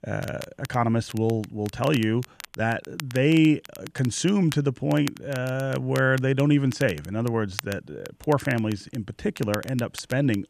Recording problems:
crackle, like an old record; noticeable; 15 dB below the speech

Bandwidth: 14.5 kHz